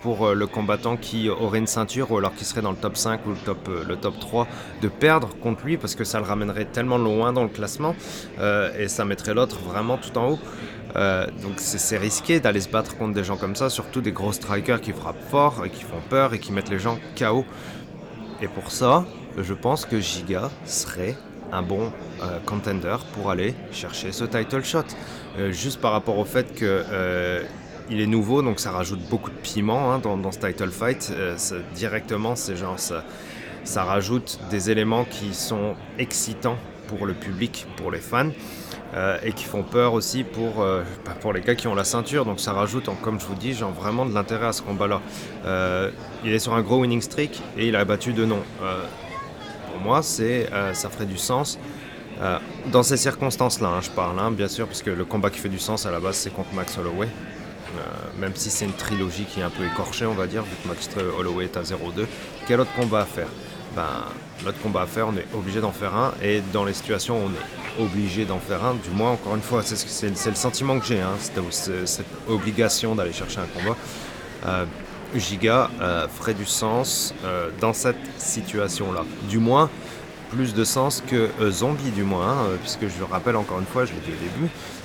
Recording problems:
murmuring crowd; noticeable; throughout; 10 dB below the speech

